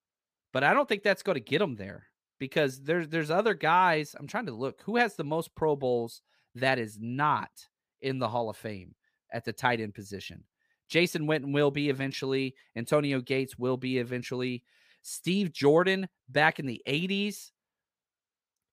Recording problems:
none

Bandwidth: 15 kHz